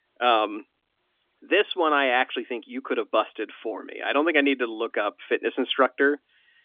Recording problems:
phone-call audio; nothing above 3.5 kHz

